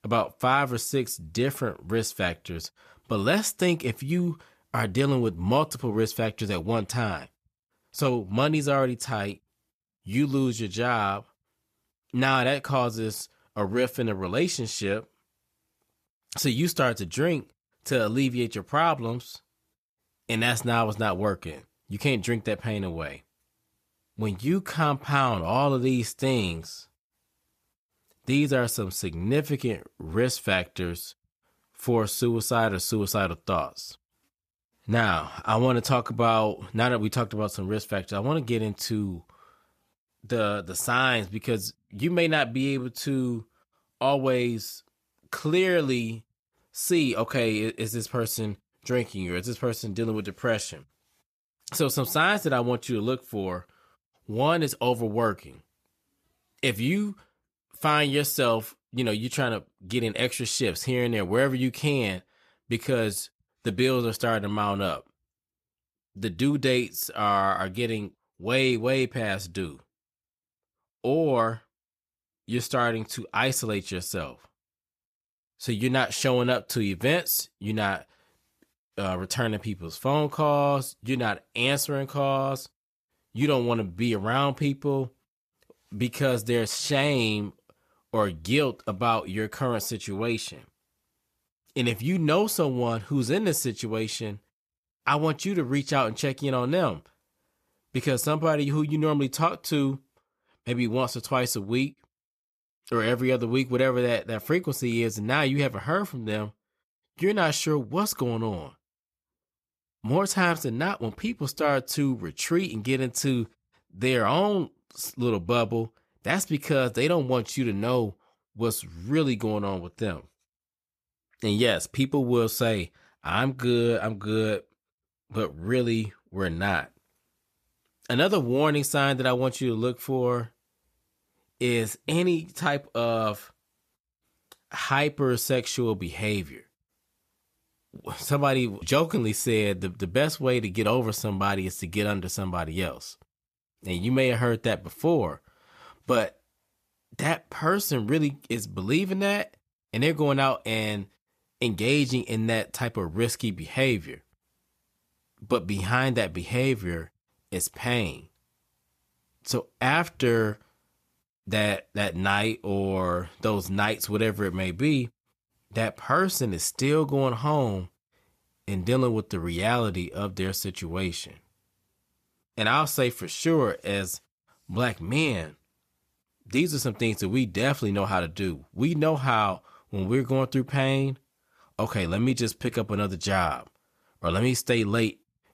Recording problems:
none

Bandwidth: 14.5 kHz